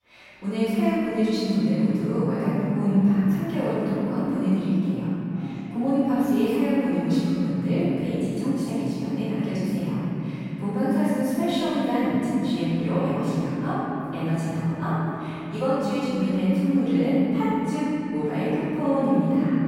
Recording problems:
room echo; strong; dies away in 3 s
off-mic speech; far
background chatter; faint; throughout; 4 voices, 25 dB below the speech

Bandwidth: 16 kHz